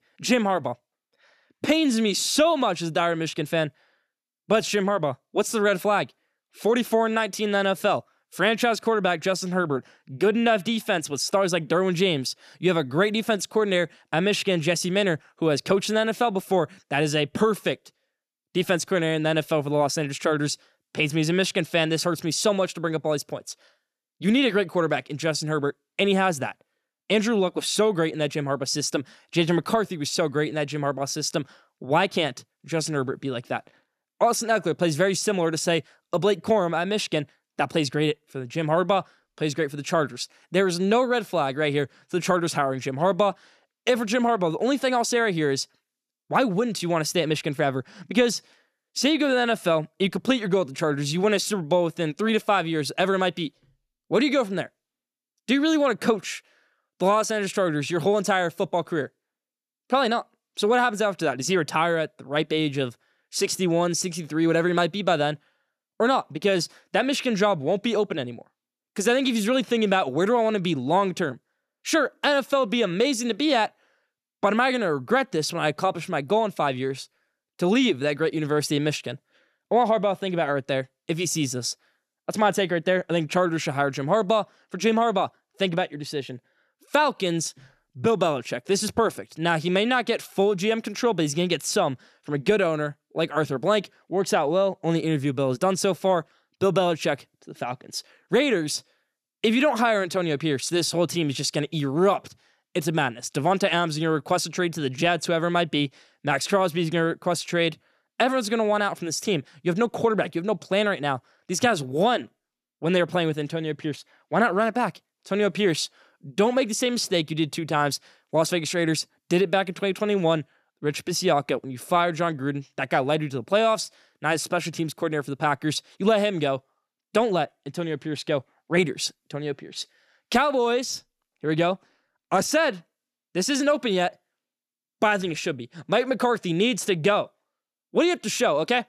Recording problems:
none

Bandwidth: 14 kHz